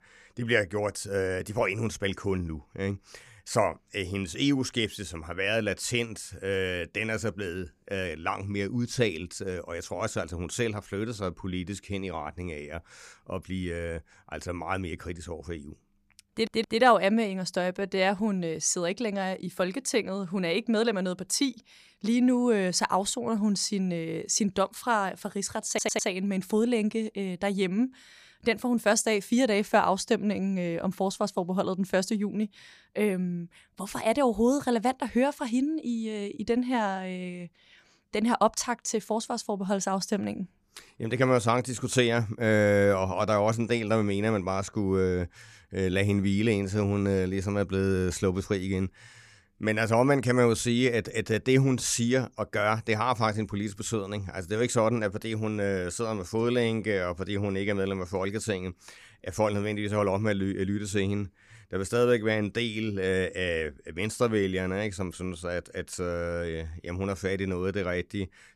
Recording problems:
audio stuttering; at 16 s and at 26 s

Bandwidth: 15 kHz